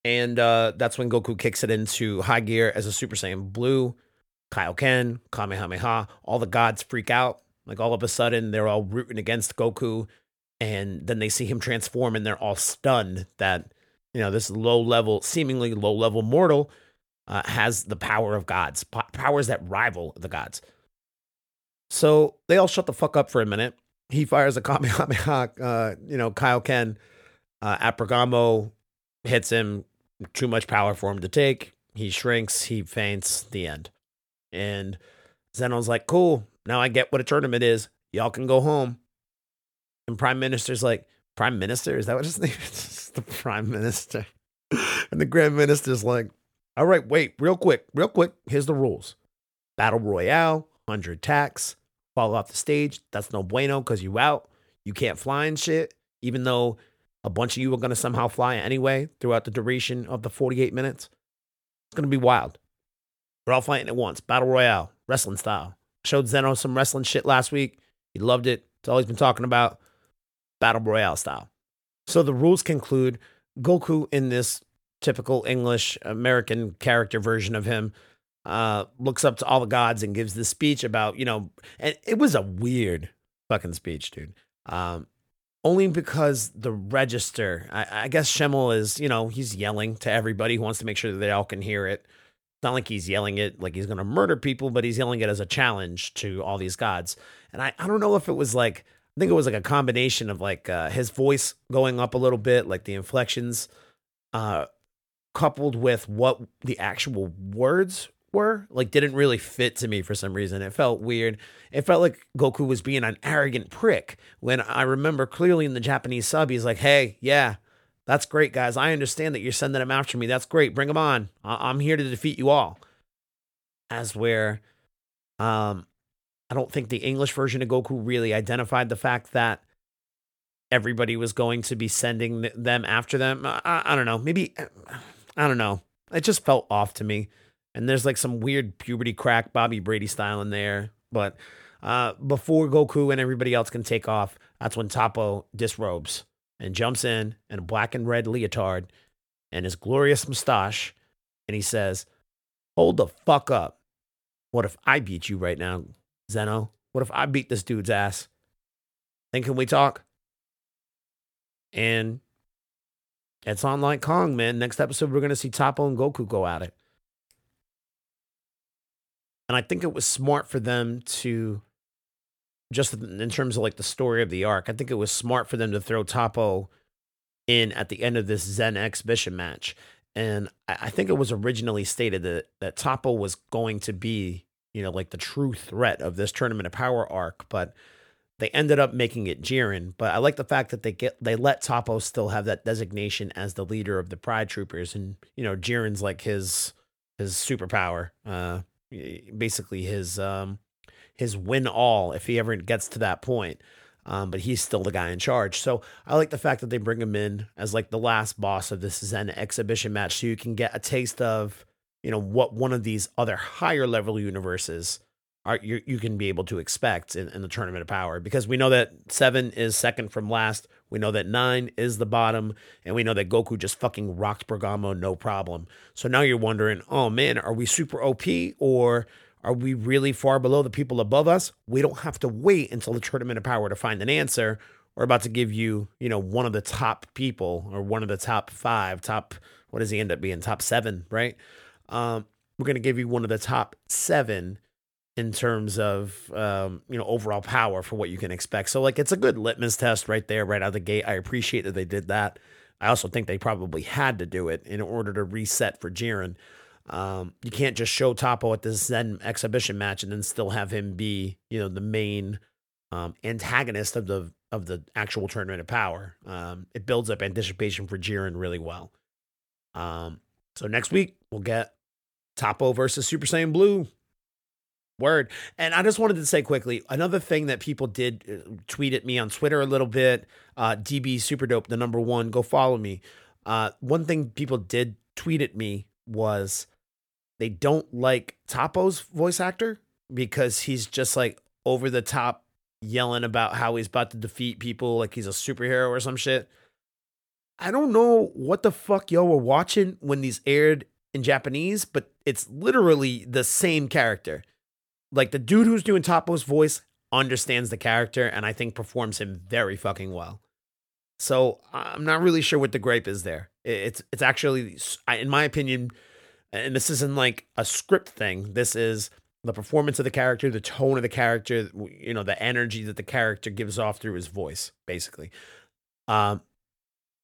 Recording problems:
none

